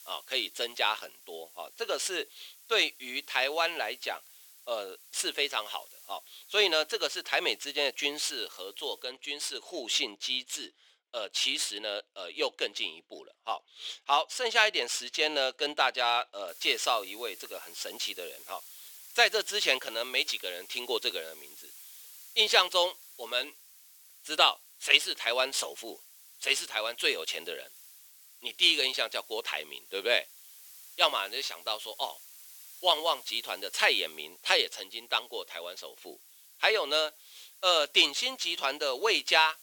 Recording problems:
thin; very; fading below 400 Hz
hiss; faint; until 9 s and from 16 s on; 20 dB below the speech

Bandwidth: 18.5 kHz